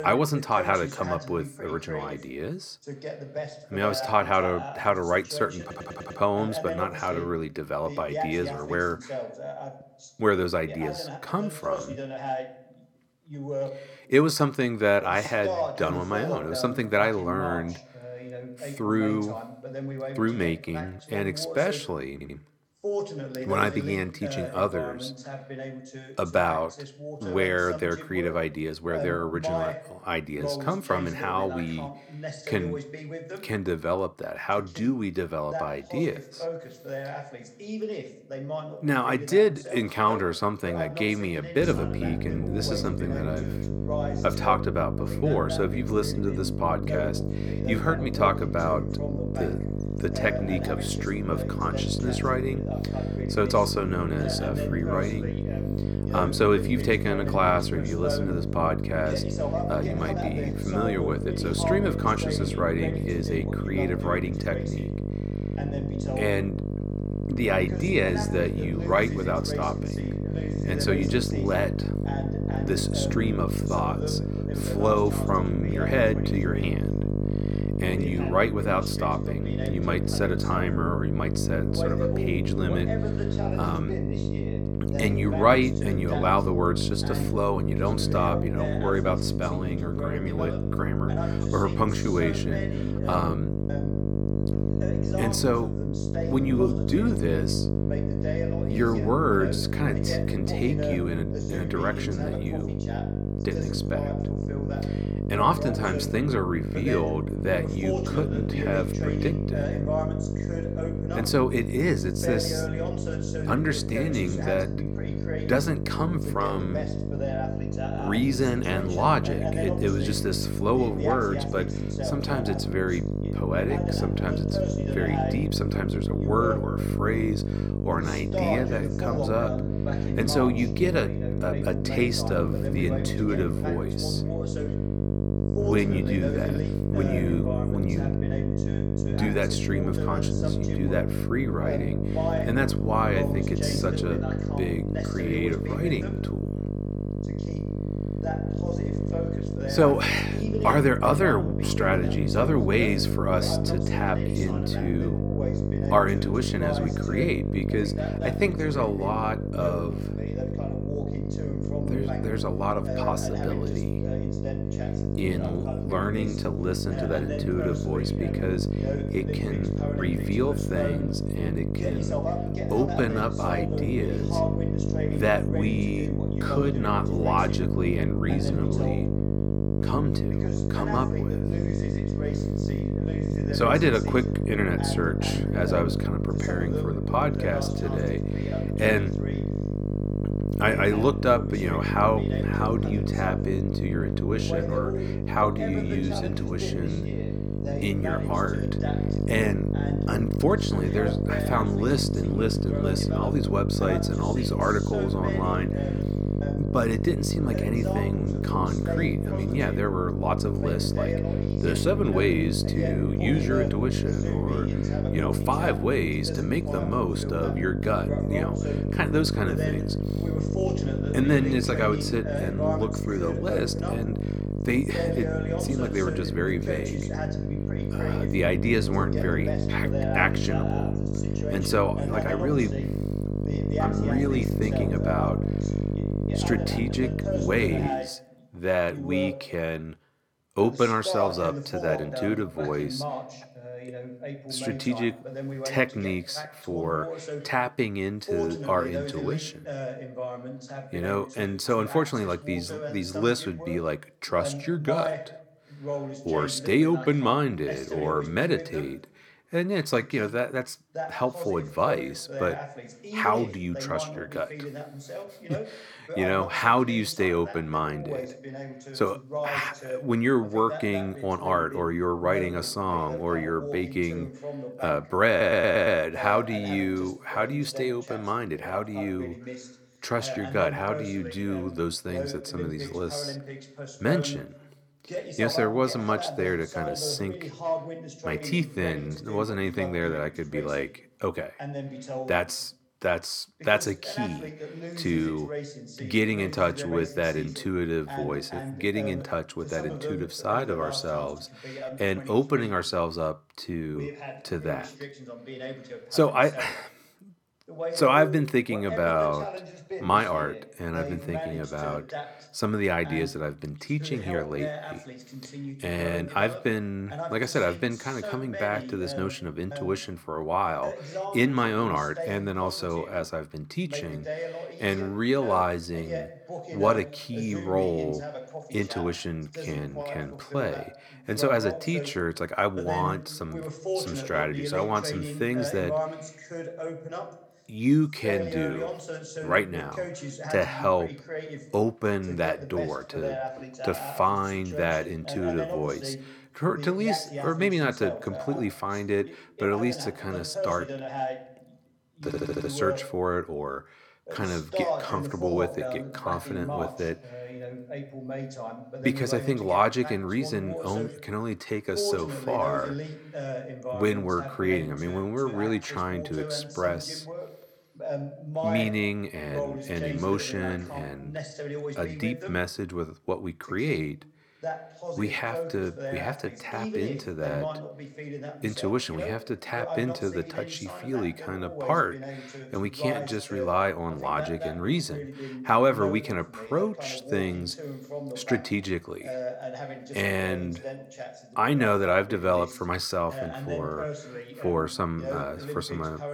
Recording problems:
electrical hum; loud; from 42 s to 3:58; 50 Hz, 7 dB below the speech
voice in the background; loud; throughout; 8 dB below the speech
audio stuttering; 4 times, first at 5.5 s

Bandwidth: 18.5 kHz